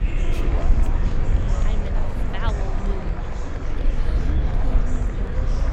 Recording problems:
murmuring crowd; very loud; throughout; 3 dB above the speech
low rumble; loud; throughout; 4 dB below the speech

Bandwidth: 16 kHz